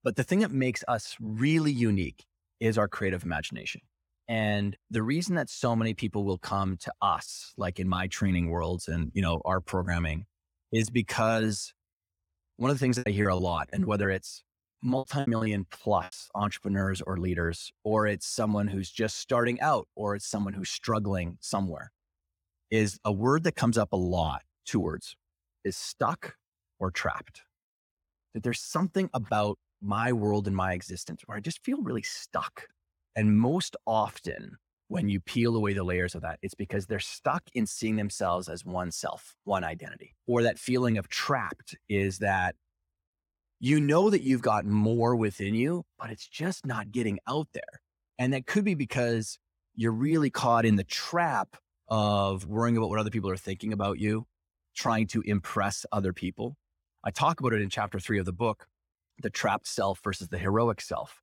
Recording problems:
choppy; very; from 13 to 16 s; 16% of the speech affected

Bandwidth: 17 kHz